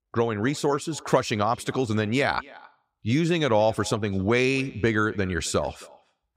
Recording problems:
echo of what is said; faint; throughout; 270 ms later, 25 dB below the speech

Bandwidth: 15.5 kHz